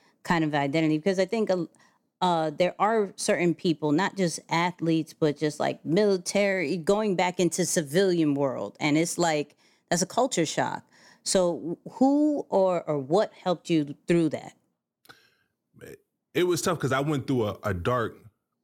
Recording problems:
none

